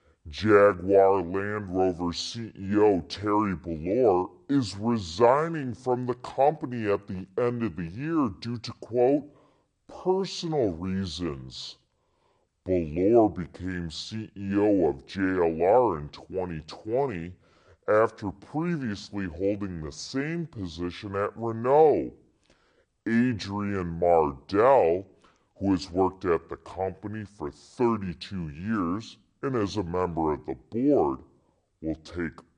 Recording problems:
wrong speed and pitch; too slow and too low; 0.7 times normal speed

